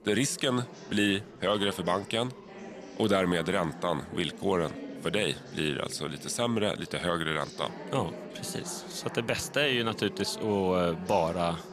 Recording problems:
chatter from many people; noticeable; throughout; 15 dB below the speech

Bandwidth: 14 kHz